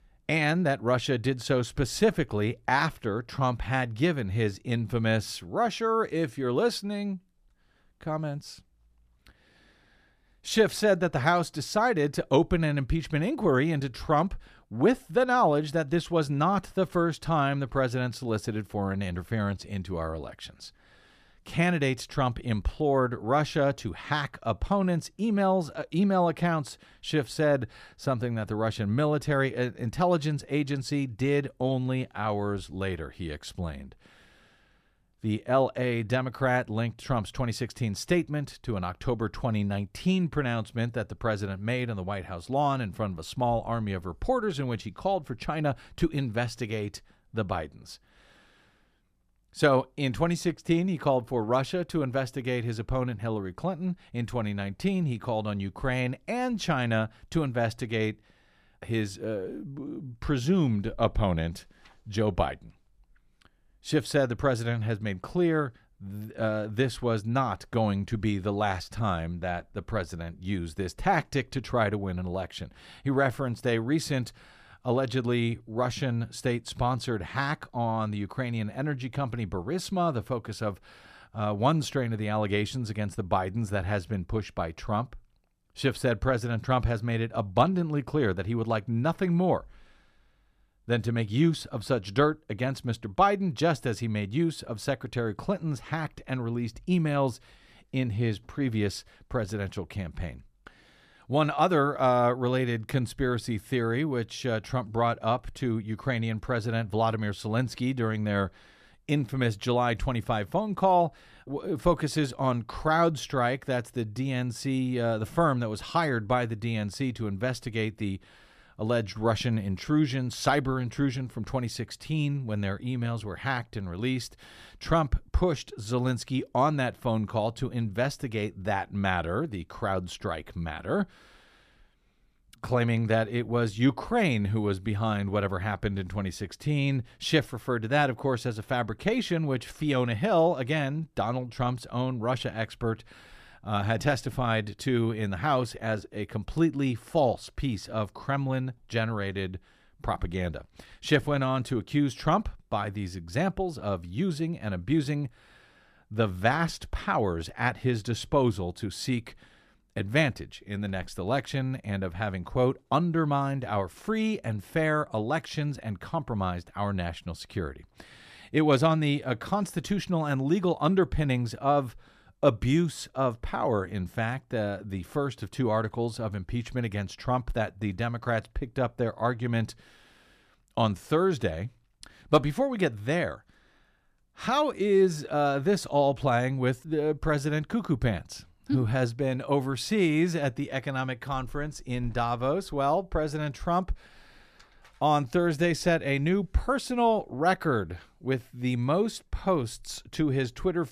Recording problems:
none

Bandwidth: 14.5 kHz